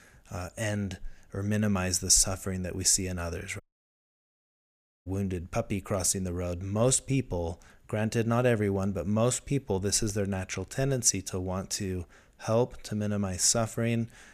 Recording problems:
audio cutting out; at 3.5 s for 1.5 s

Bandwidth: 15 kHz